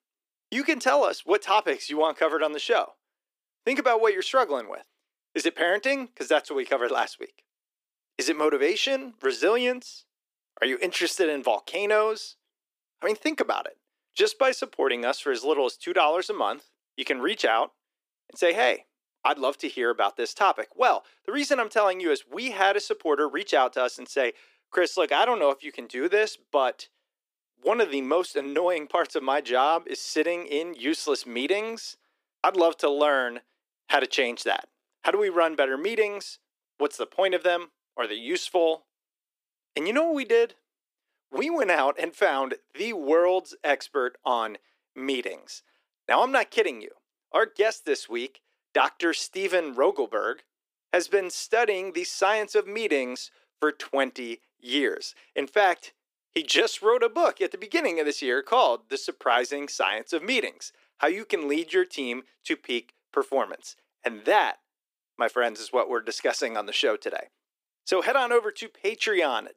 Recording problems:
thin; somewhat; fading below 300 Hz

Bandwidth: 15 kHz